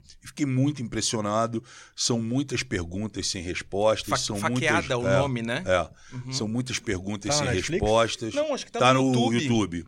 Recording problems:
none

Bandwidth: 16 kHz